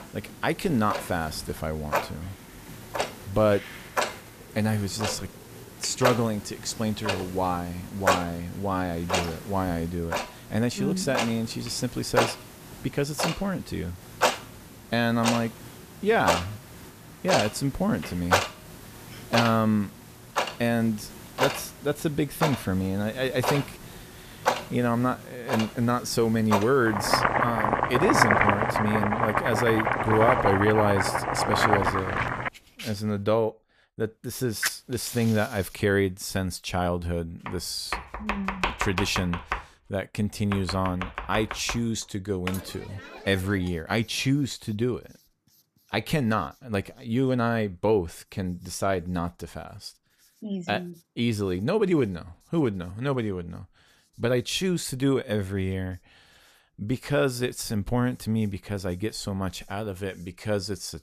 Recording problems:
household noises; loud; throughout; 1 dB below the speech

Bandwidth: 14.5 kHz